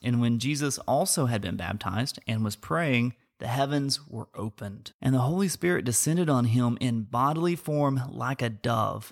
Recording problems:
none

